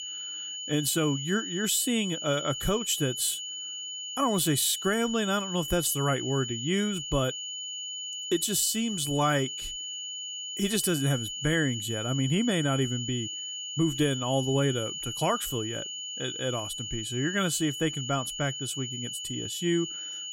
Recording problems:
high-pitched whine; loud; throughout; 3 kHz, 5 dB below the speech

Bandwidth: 16 kHz